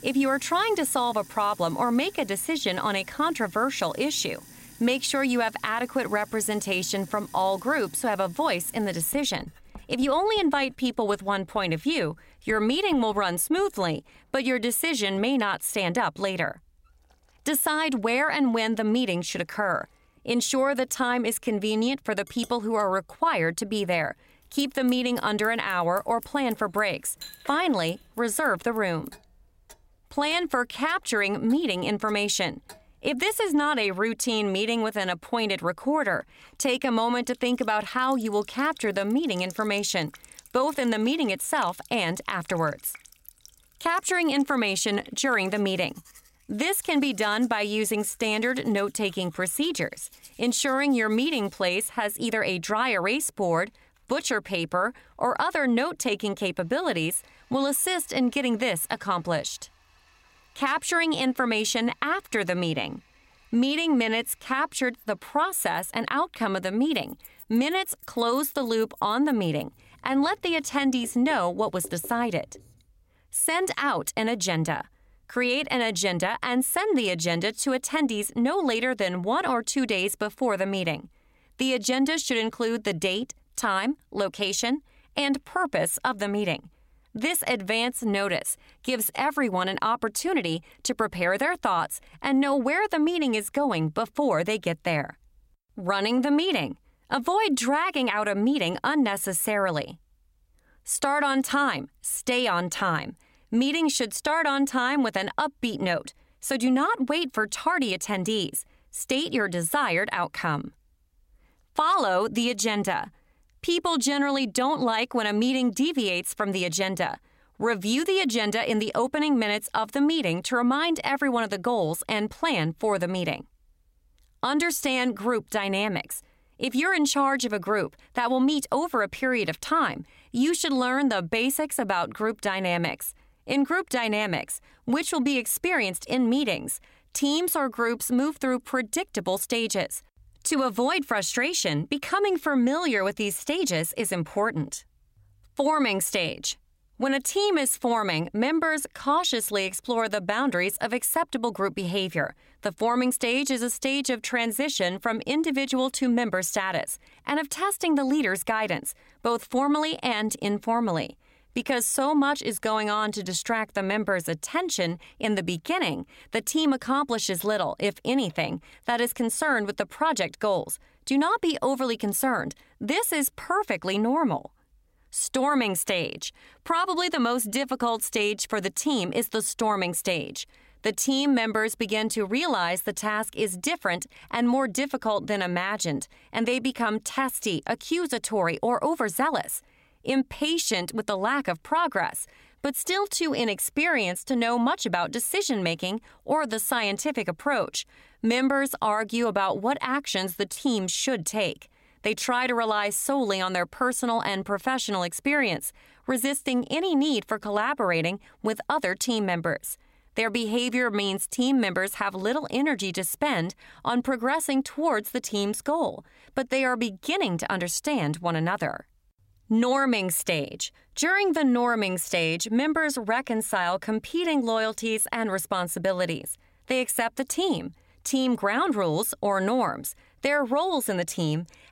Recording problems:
household noises; faint; until 1:13; 25 dB below the speech

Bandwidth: 16 kHz